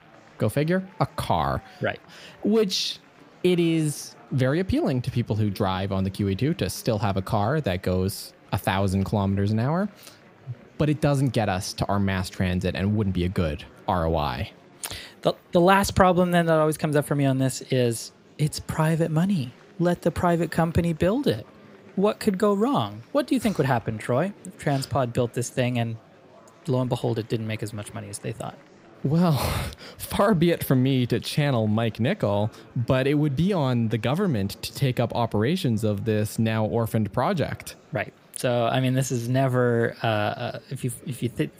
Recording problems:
murmuring crowd; faint; throughout; 25 dB below the speech

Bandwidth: 15.5 kHz